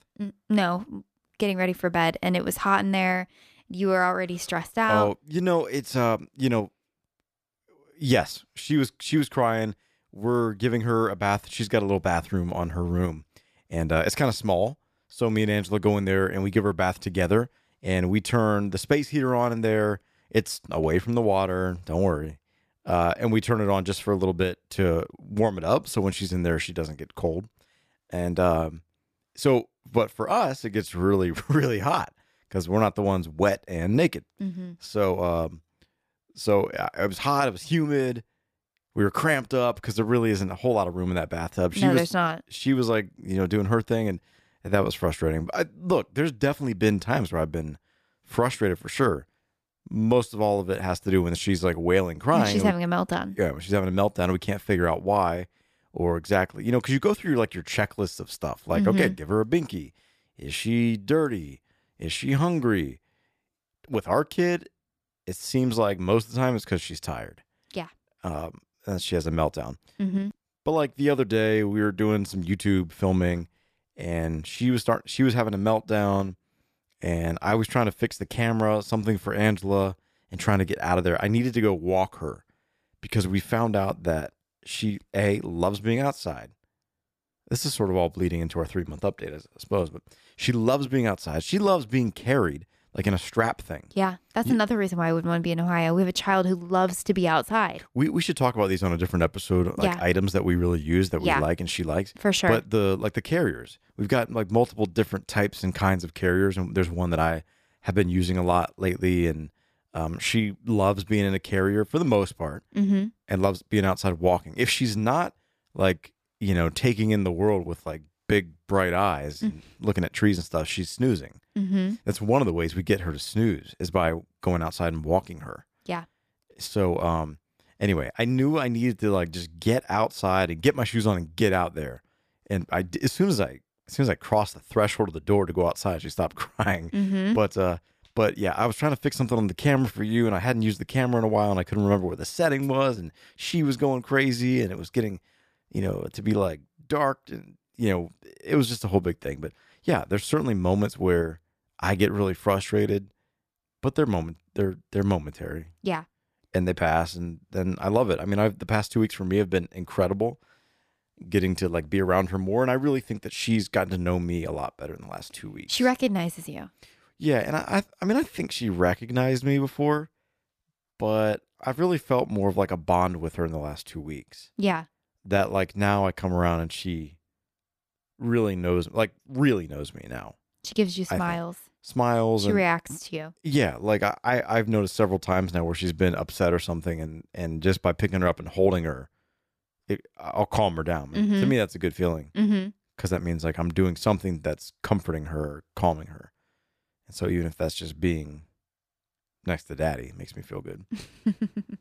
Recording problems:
none

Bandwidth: 14.5 kHz